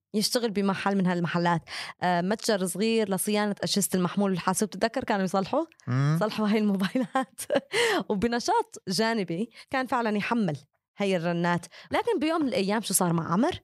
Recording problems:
none

